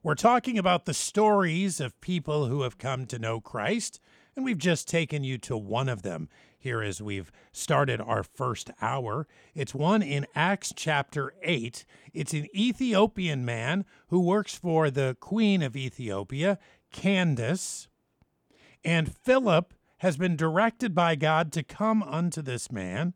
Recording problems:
none

